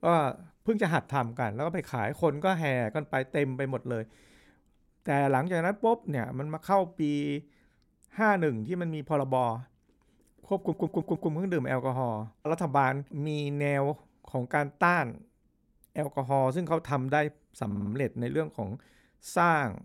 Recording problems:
audio stuttering; at 11 s and at 18 s

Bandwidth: 16 kHz